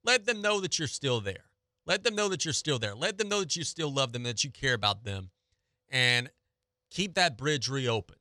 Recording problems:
none

